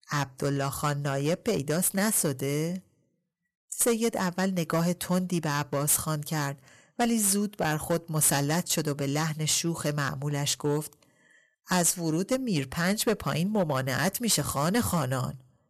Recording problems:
distortion; slight; 4% of the sound clipped

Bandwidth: 13.5 kHz